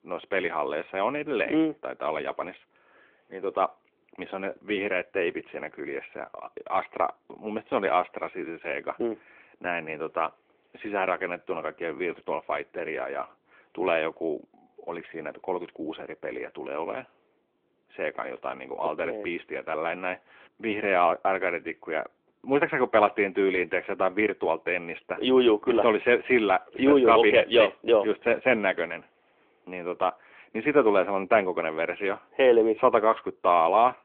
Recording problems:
phone-call audio; nothing above 3.5 kHz

